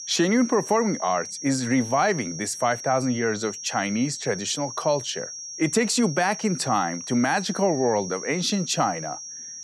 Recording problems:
high-pitched whine; loud; throughout; 5.5 kHz, 9 dB below the speech

